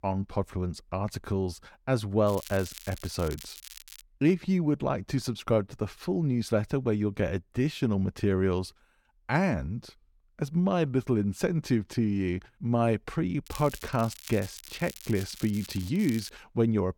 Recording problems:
crackling; noticeable; from 2.5 to 4 s and from 13 to 16 s; 15 dB below the speech

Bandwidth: 17.5 kHz